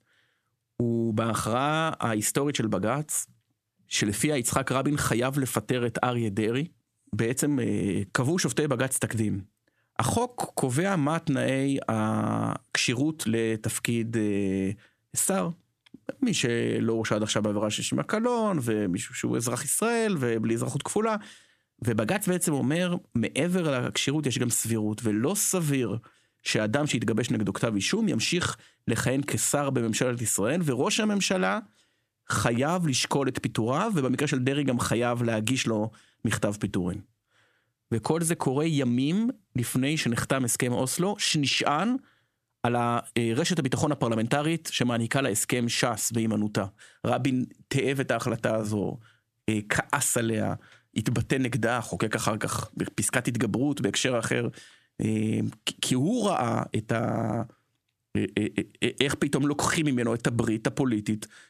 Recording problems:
squashed, flat; somewhat

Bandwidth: 14.5 kHz